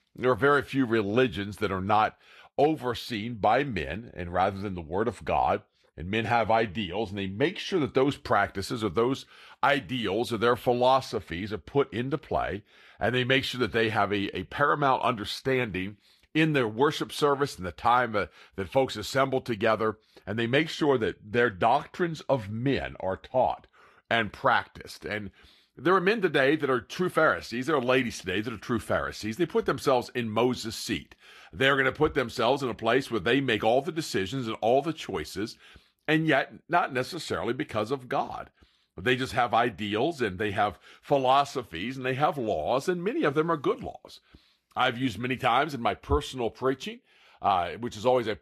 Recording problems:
garbled, watery; slightly; nothing above 13 kHz

